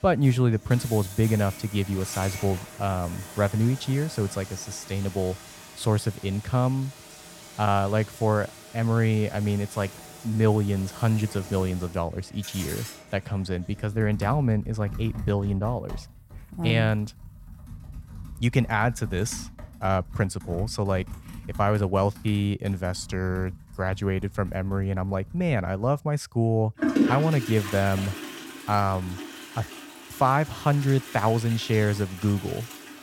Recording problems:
household noises; noticeable; throughout; 10 dB below the speech

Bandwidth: 16.5 kHz